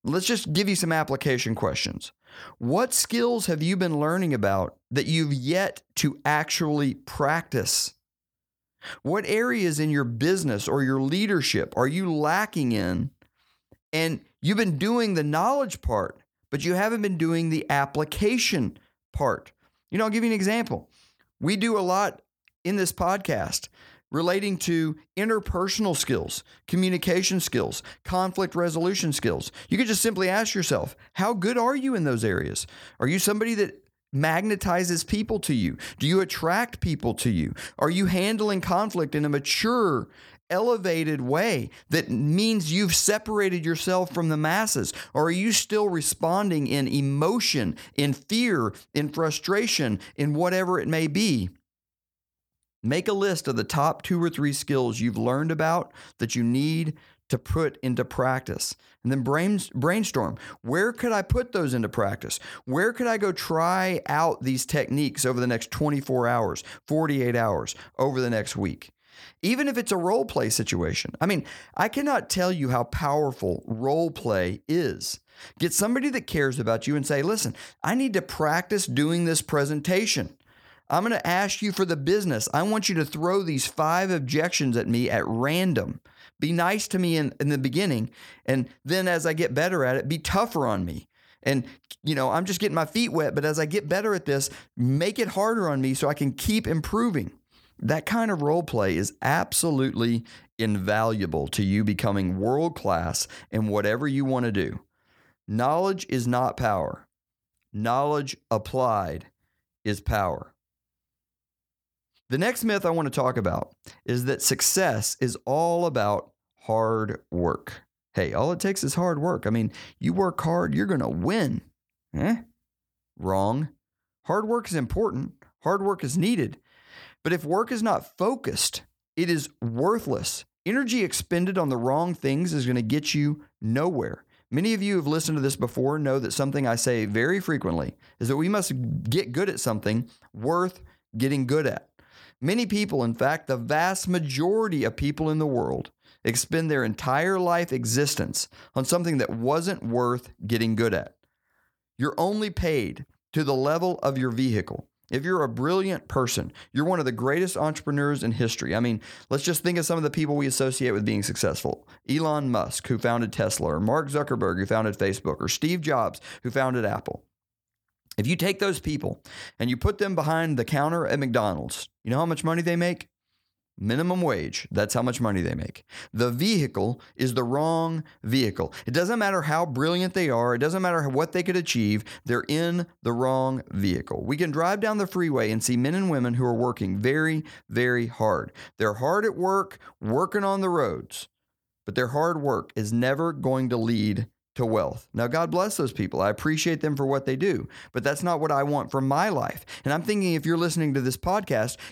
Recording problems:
none

